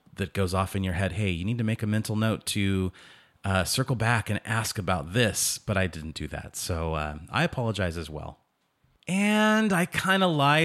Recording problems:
abrupt cut into speech; at the end

